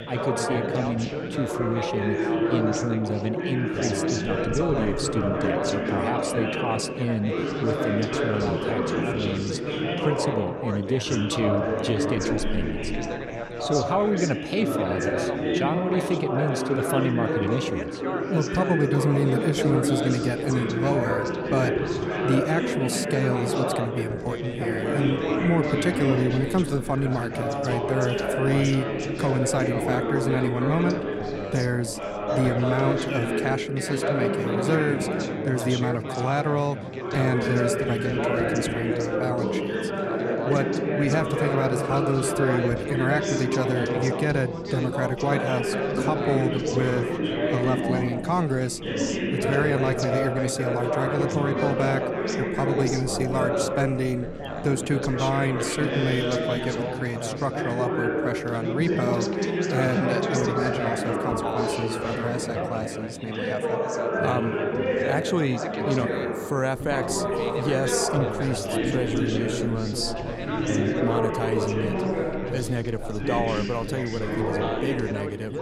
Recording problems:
chatter from many people; very loud; throughout; 1 dB above the speech

